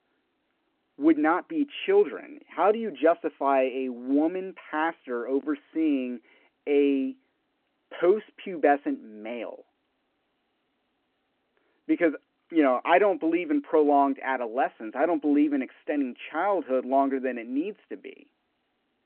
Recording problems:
phone-call audio

